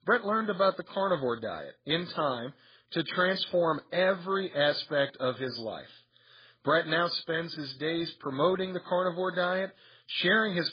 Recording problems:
garbled, watery; badly; nothing above 5 kHz

